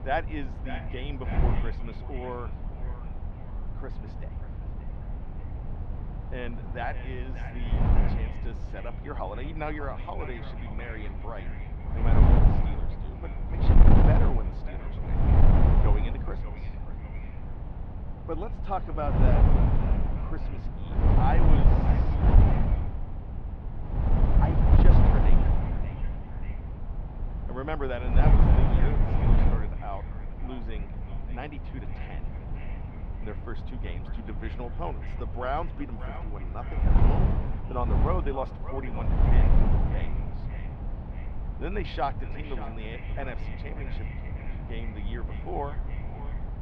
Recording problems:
echo of what is said; strong; throughout; 590 ms later, 10 dB below the speech
muffled; very; fading above 3 kHz
wind noise on the microphone; heavy; 2 dB below the speech

